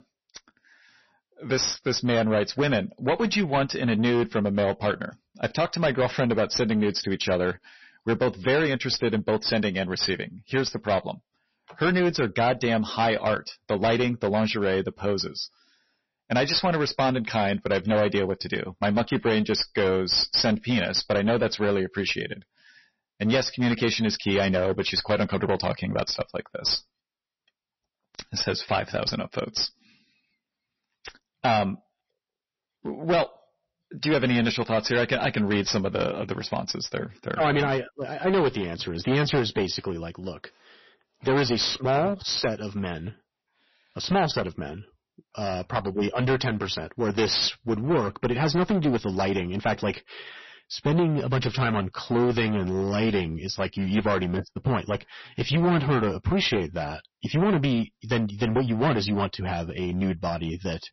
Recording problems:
distortion; heavy; 11% of the sound clipped
garbled, watery; slightly; nothing above 6 kHz

